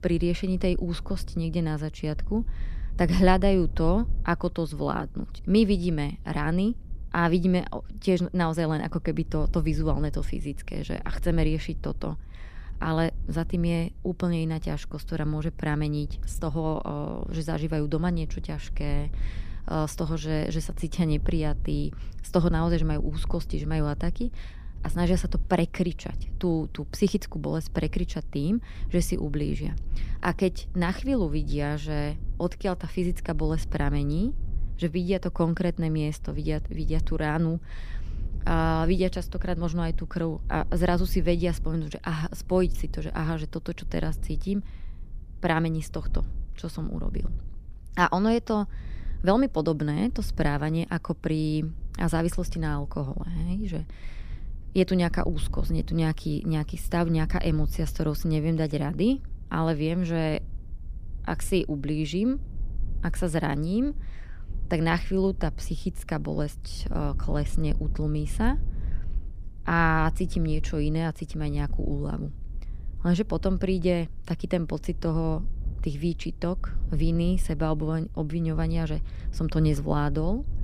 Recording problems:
low rumble; faint; throughout; 25 dB below the speech

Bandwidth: 15 kHz